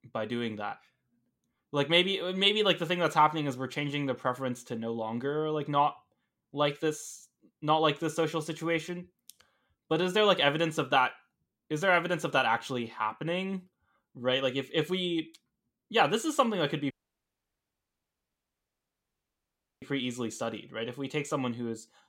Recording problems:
audio cutting out; at 17 s for 3 s

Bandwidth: 16 kHz